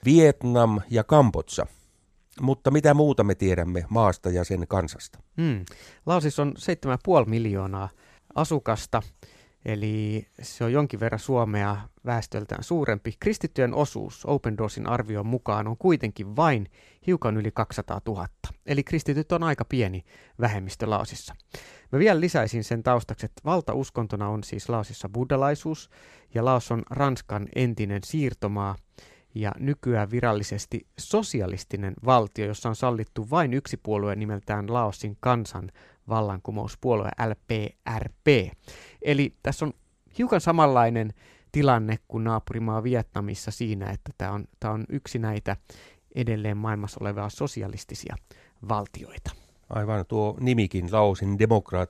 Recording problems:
none

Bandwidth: 14.5 kHz